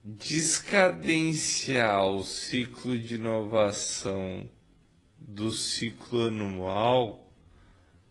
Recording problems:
wrong speed, natural pitch; too slow; 0.5 times normal speed
garbled, watery; slightly

